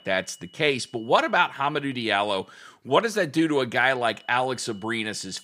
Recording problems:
high-pitched whine; faint; until 2.5 s and from 4 s on; 3 kHz, 30 dB below the speech

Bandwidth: 15.5 kHz